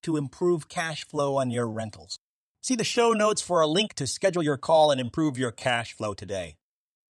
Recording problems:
uneven, jittery; strongly; from 0.5 to 6 s

